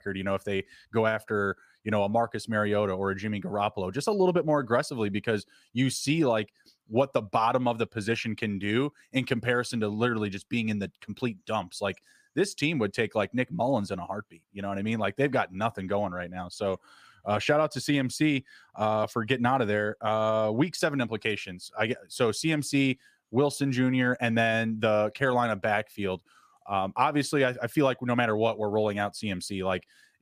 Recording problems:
none

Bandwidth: 15 kHz